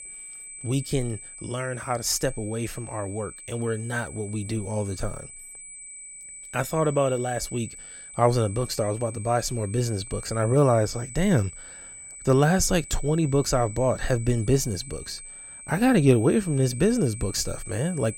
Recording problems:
high-pitched whine; noticeable; throughout; 8 kHz, 15 dB below the speech

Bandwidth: 16 kHz